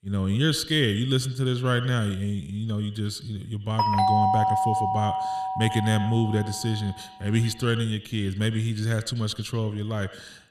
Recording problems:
echo of what is said; noticeable; throughout; 90 ms later, 15 dB below the speech
doorbell; loud; from 4 to 6.5 s; peak 5 dB above the speech

